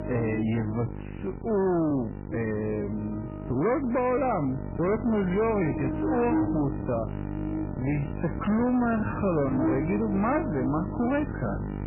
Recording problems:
garbled, watery; badly; nothing above 2.5 kHz
wrong speed, natural pitch; too slow; 0.6 times normal speed
distortion; slight; 10 dB below the speech
electrical hum; loud; throughout; 50 Hz, 7 dB below the speech
uneven, jittery; strongly; from 1 to 11 s

